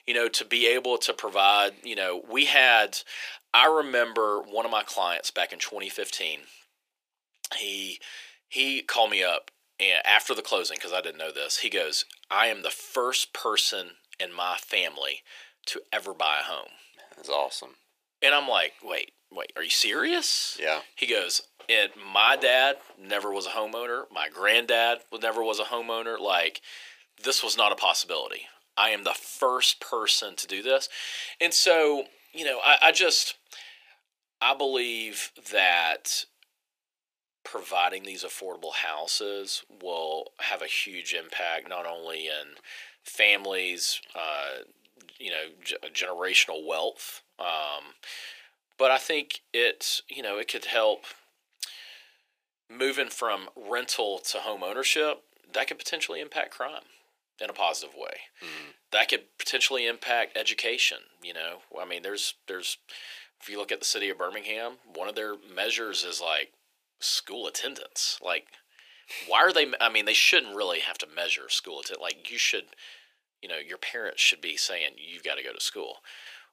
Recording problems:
thin; very; fading below 400 Hz

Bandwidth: 15 kHz